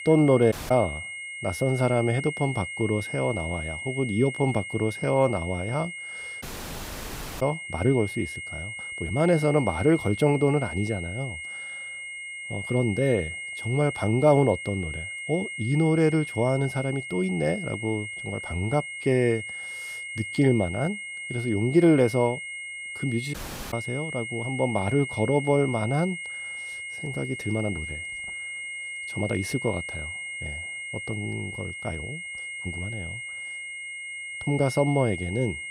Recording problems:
high-pitched whine; loud; throughout; 2 kHz, 8 dB below the speech
audio cutting out; at 0.5 s, at 6.5 s for 1 s and at 23 s
uneven, jittery; strongly; from 5 to 35 s

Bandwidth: 15.5 kHz